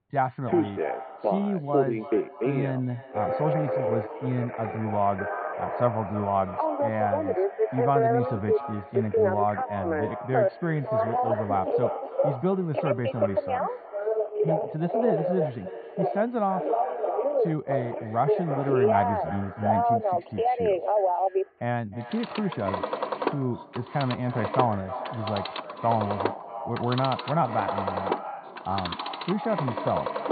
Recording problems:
echo of what is said; strong; throughout; 310 ms later, 9 dB below the speech
high frequencies cut off; severe; nothing above 4.5 kHz
muffled; very slightly; fading above 1.5 kHz
alarms or sirens; very loud; throughout; 1 dB above the speech

